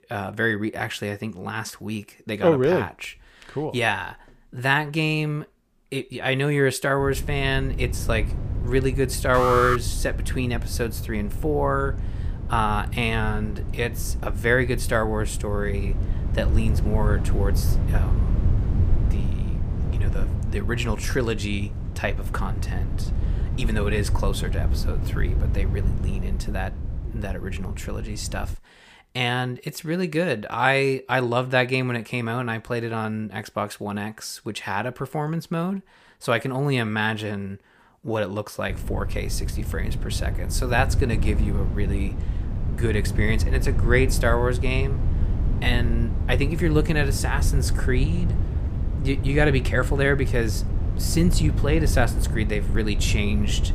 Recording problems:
wind noise on the microphone; occasional gusts; from 7 to 29 s and from 39 s on; 15 dB below the speech
alarm; loud; at 9.5 s; peak 3 dB above the speech

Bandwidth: 15 kHz